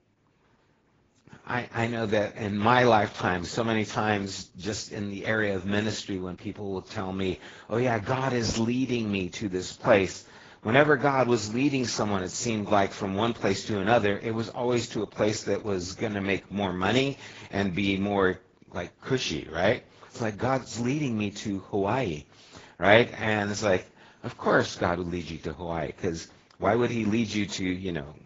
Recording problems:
garbled, watery; badly
high frequencies cut off; noticeable; nothing above 7.5 kHz

